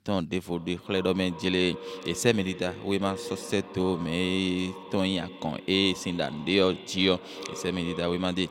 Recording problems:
echo of what is said; noticeable; throughout; 370 ms later, 15 dB below the speech

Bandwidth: 16 kHz